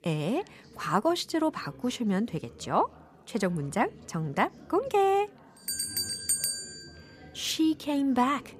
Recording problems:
background chatter; faint; throughout; 4 voices, 20 dB below the speech

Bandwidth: 14.5 kHz